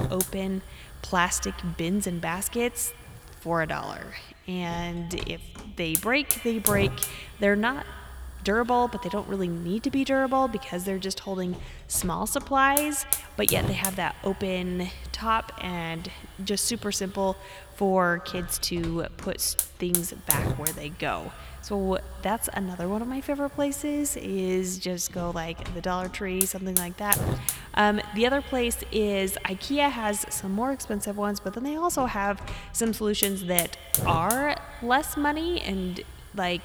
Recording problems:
echo of what is said; faint; throughout; 90 ms later, 20 dB below the speech
hiss; loud; throughout; 2 dB below the speech

